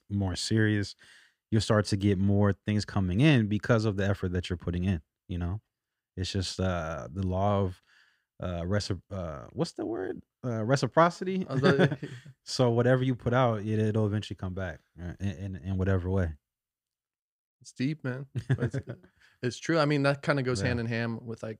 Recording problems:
none

